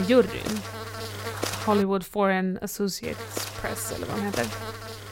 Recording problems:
electrical hum; loud; until 2 s and from 3 s on; 50 Hz, 6 dB below the speech
abrupt cut into speech; at the start

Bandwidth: 16 kHz